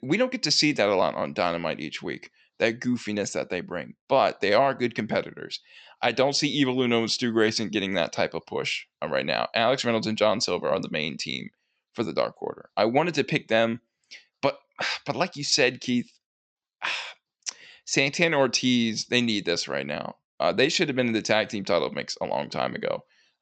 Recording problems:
high frequencies cut off; noticeable; nothing above 8 kHz

